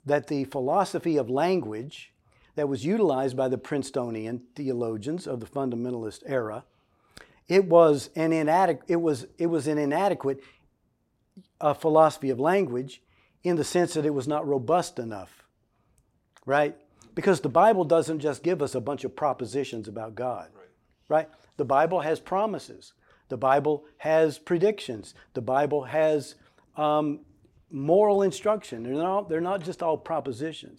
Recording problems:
none

